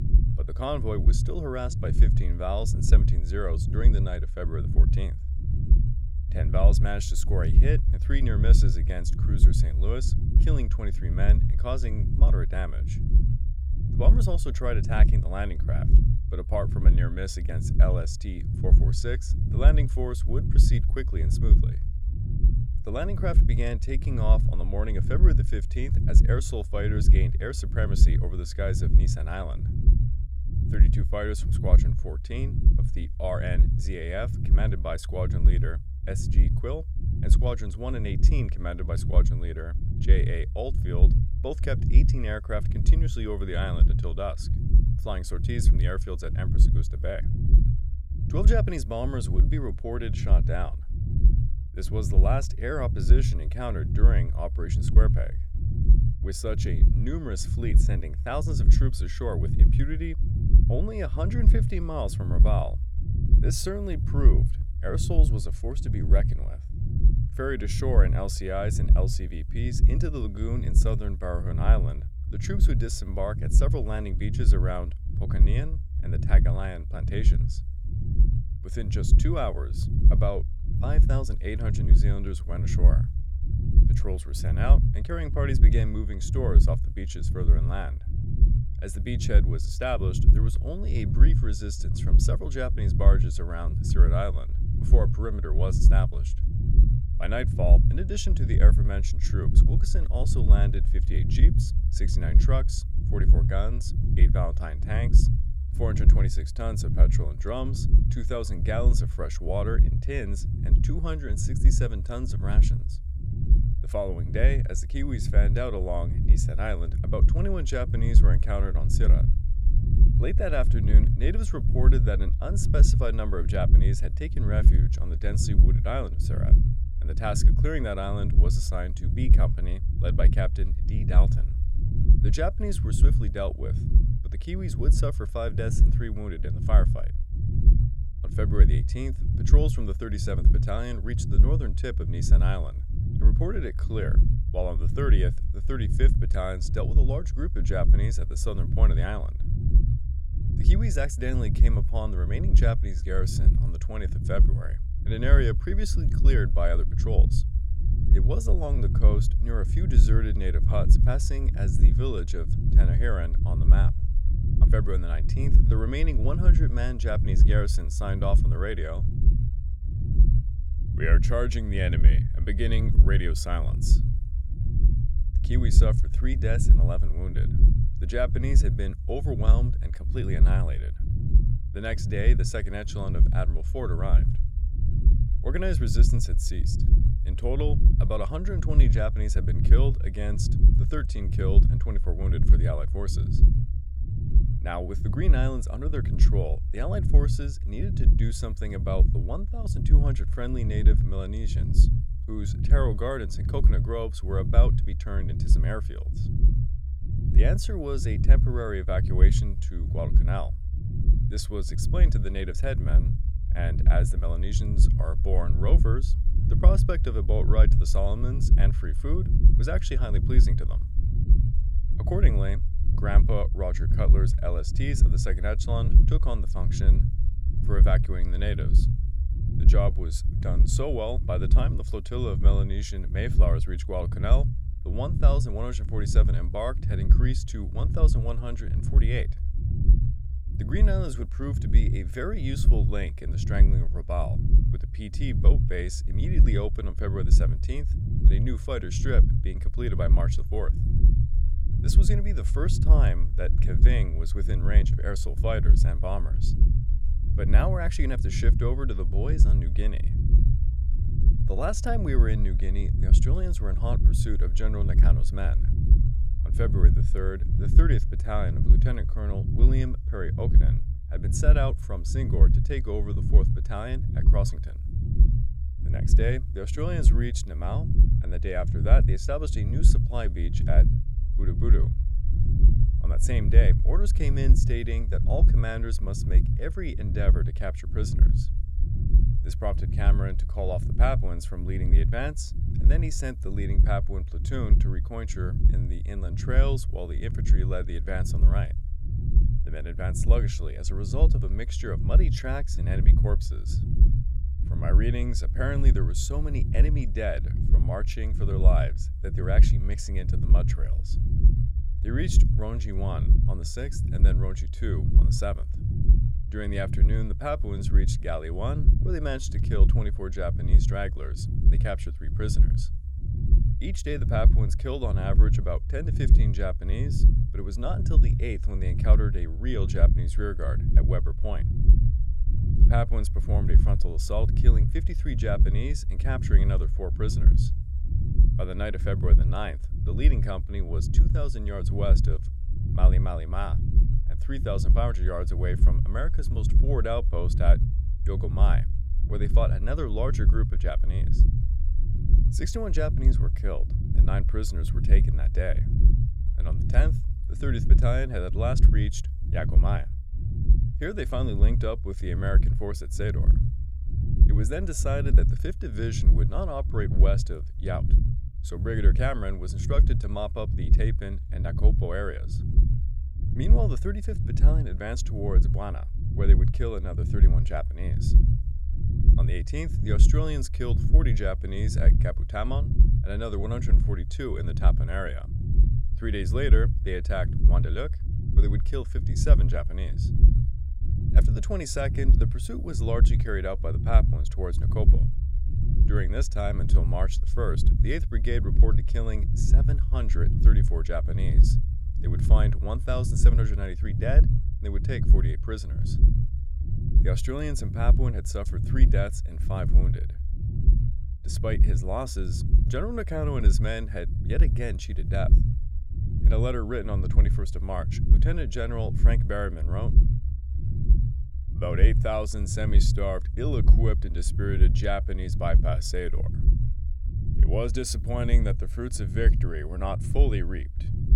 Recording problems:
low rumble; loud; throughout; 7 dB below the speech

